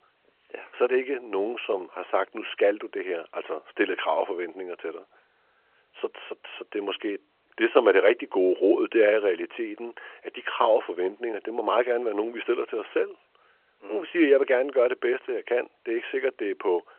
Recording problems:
phone-call audio

